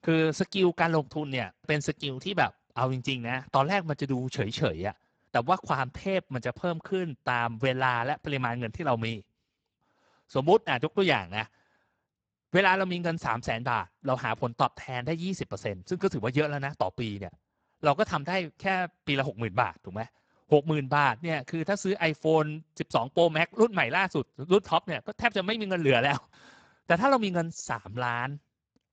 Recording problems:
garbled, watery; badly; nothing above 7.5 kHz

